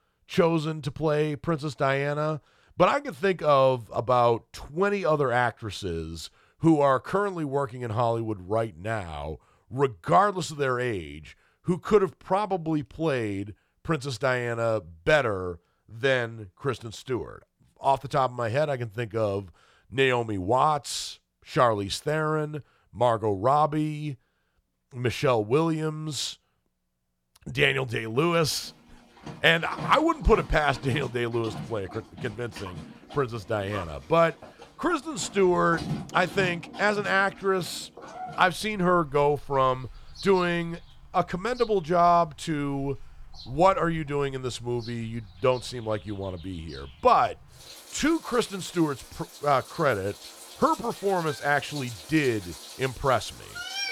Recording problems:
animal sounds; noticeable; from 28 s on; 15 dB below the speech

